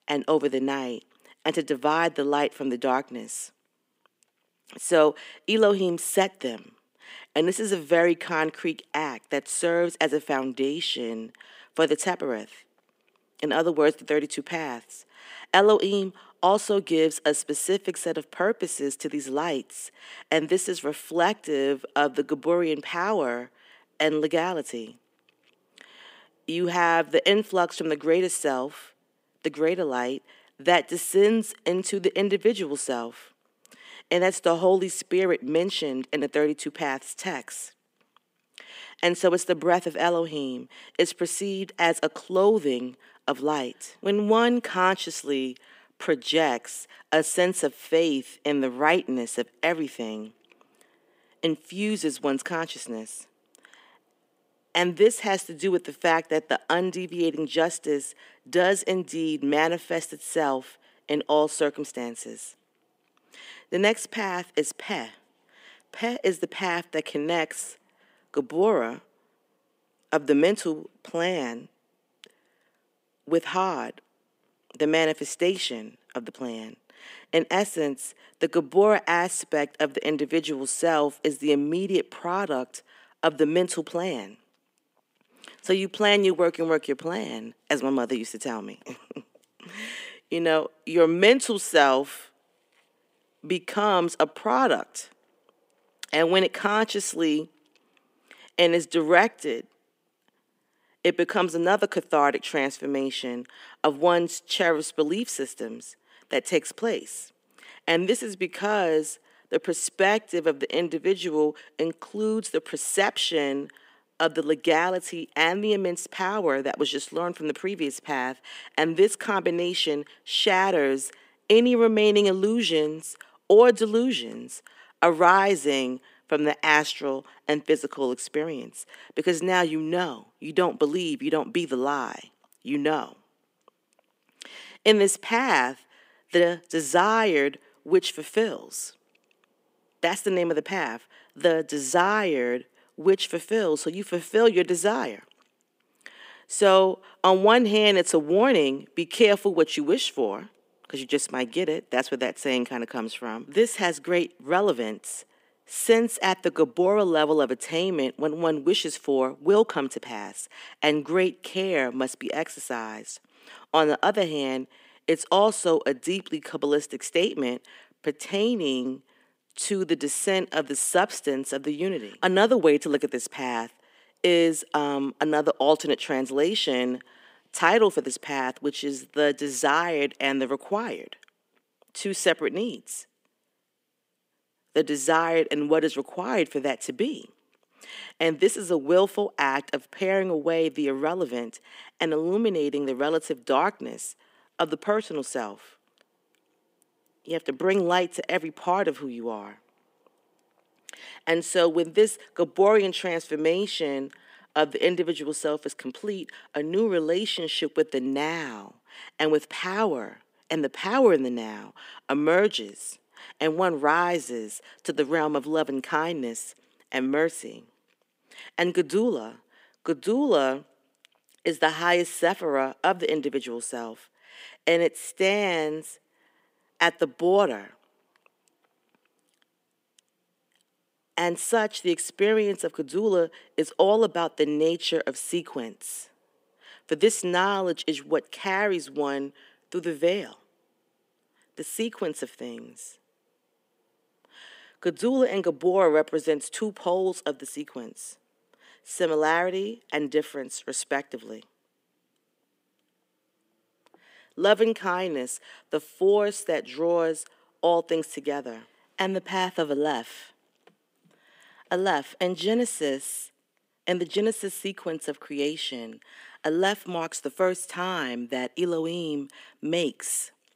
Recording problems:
thin; somewhat; fading below 350 Hz

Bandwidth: 15.5 kHz